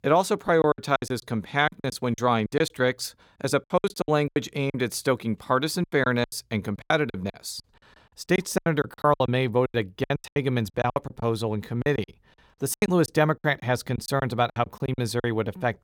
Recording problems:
choppy; very; 17% of the speech affected

